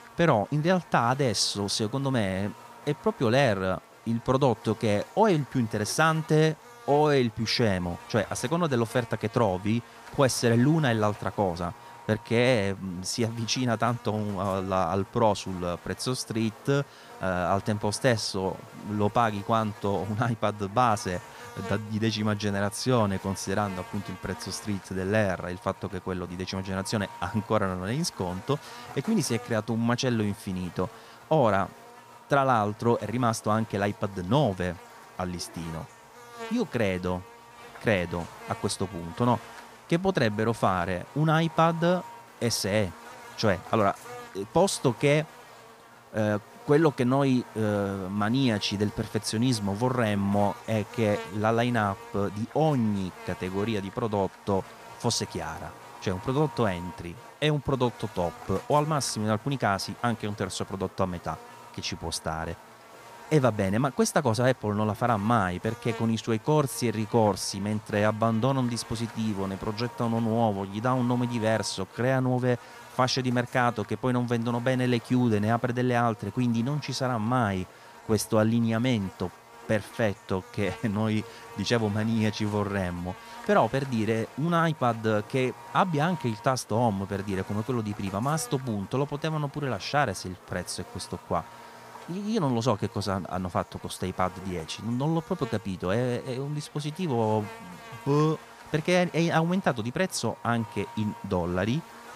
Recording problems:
electrical hum; noticeable; throughout; 50 Hz, 15 dB below the speech

